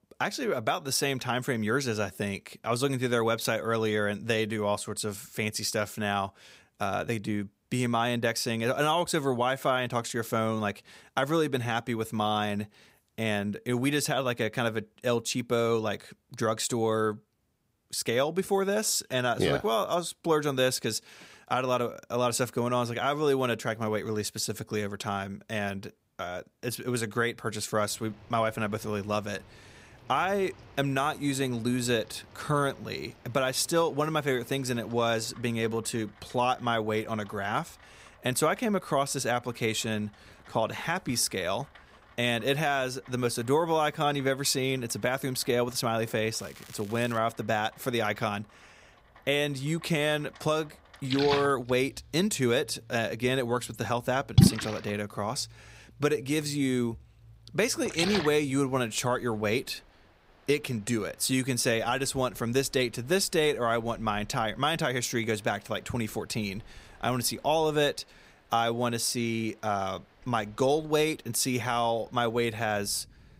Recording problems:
rain or running water; very loud; from 28 s on; as loud as the speech
crackling; faint; at 46 s; 20 dB below the speech

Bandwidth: 15.5 kHz